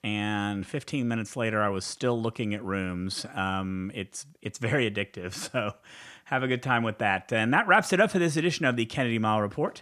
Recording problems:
none

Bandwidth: 14.5 kHz